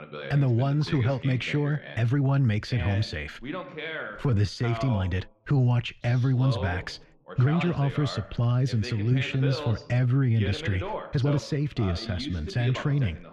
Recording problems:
muffled; slightly; fading above 3 kHz
voice in the background; noticeable; throughout; 10 dB below the speech
uneven, jittery; strongly; from 2 to 13 s

